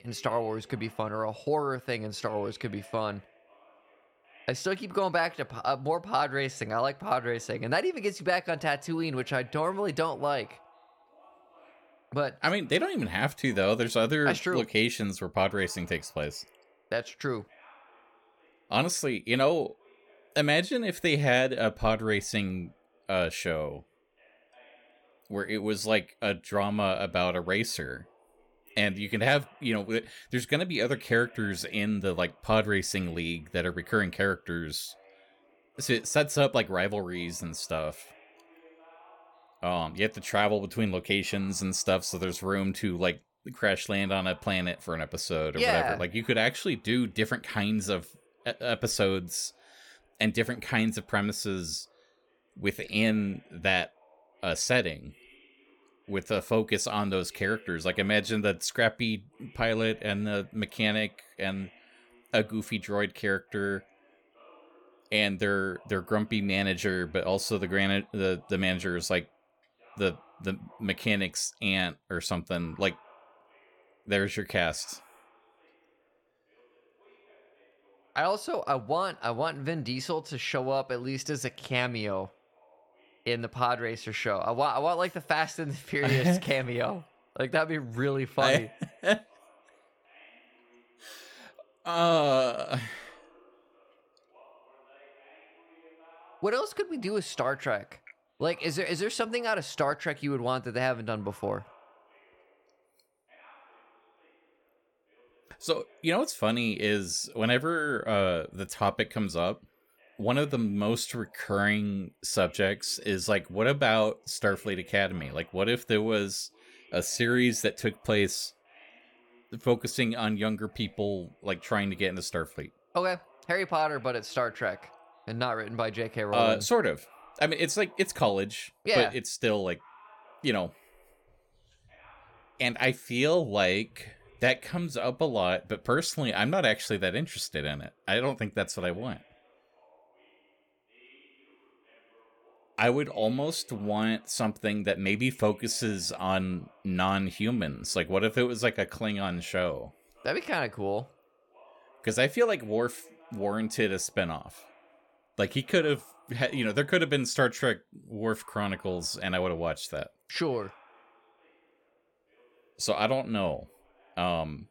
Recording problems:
voice in the background; faint; throughout; 30 dB below the speech

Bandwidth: 17.5 kHz